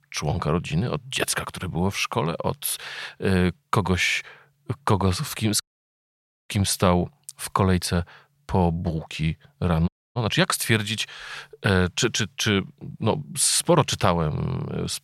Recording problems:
audio cutting out; at 5.5 s for 1 s and at 10 s

